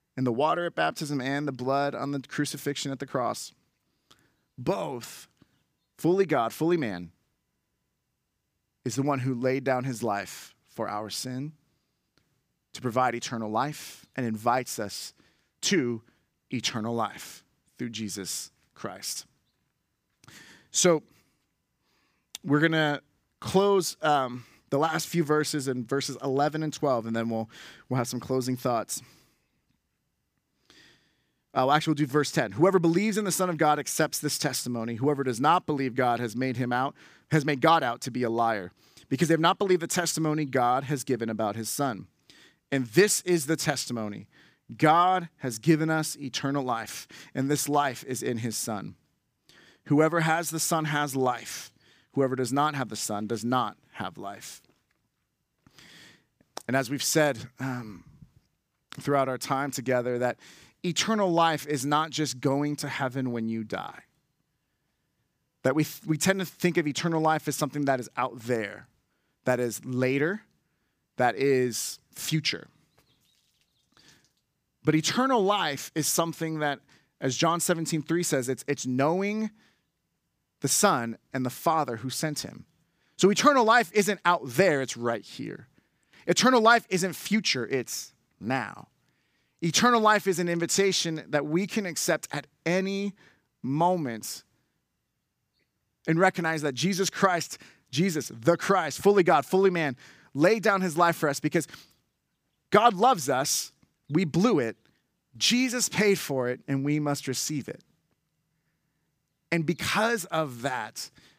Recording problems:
none

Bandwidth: 15 kHz